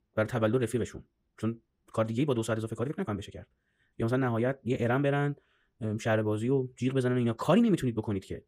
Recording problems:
wrong speed, natural pitch; too fast; 1.5 times normal speed

